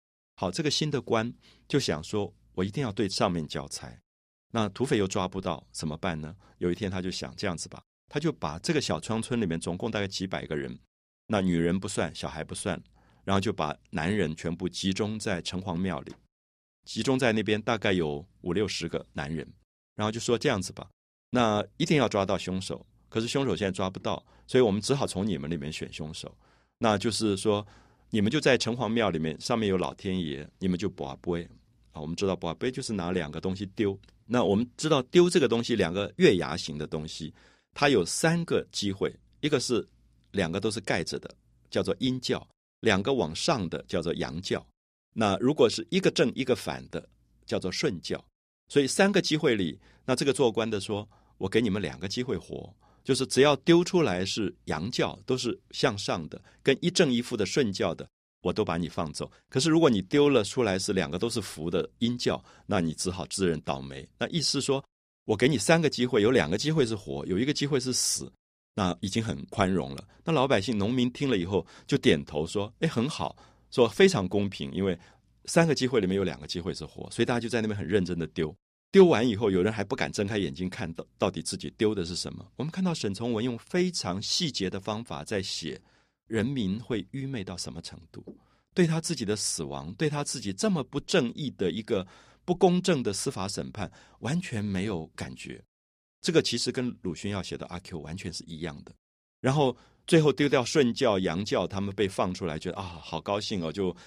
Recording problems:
none

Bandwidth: 15 kHz